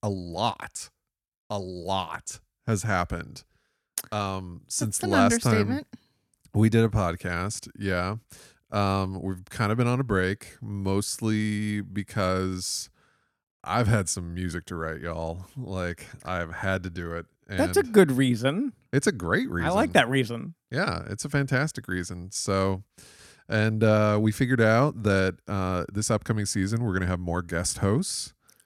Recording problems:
none

